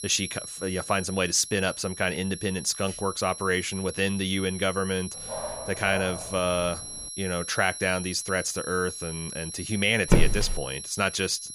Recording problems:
high-pitched whine; loud; throughout; 11 kHz, 9 dB below the speech
dog barking; noticeable; from 5 to 7 s; peak 8 dB below the speech
footsteps; loud; at 10 s; peak 3 dB above the speech

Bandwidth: 15 kHz